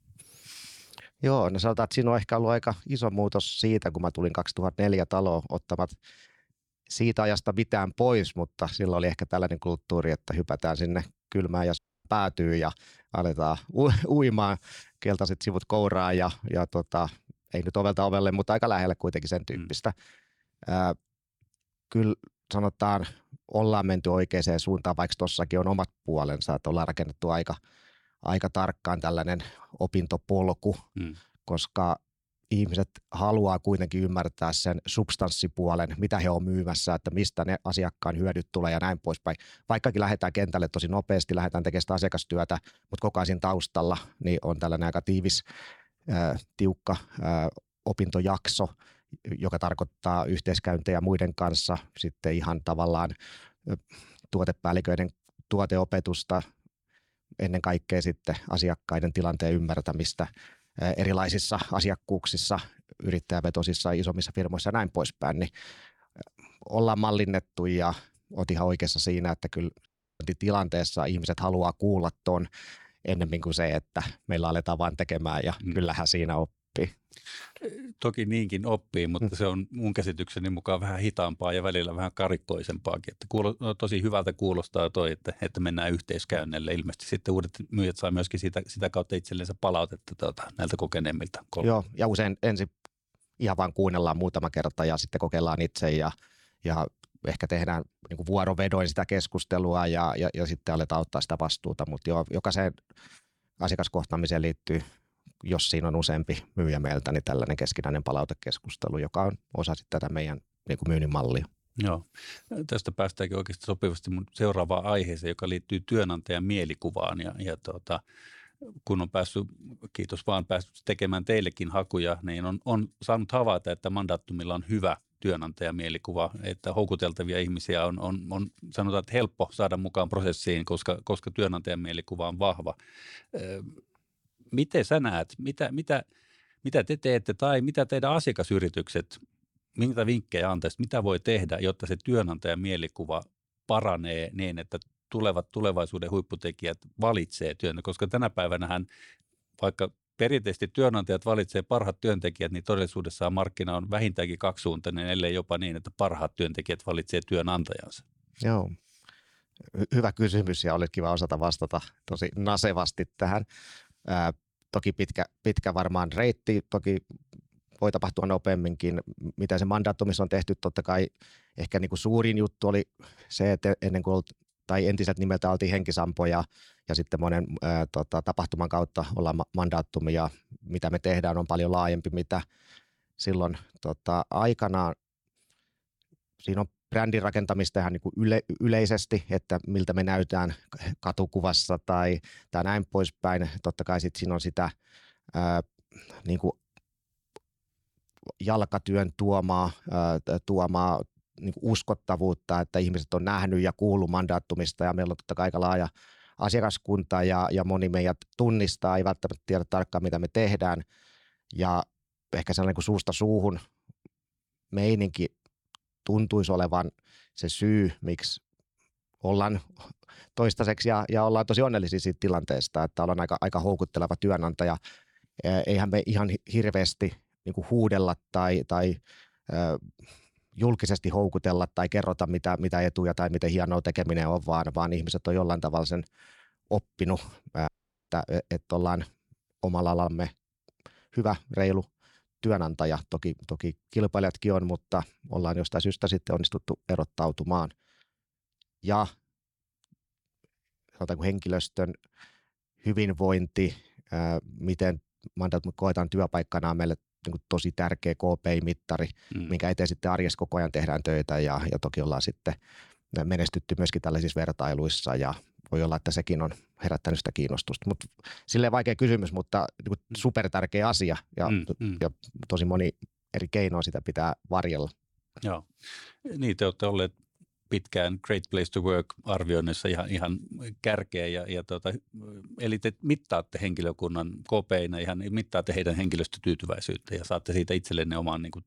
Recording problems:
audio cutting out; at 12 s, at 1:10 and at 3:58

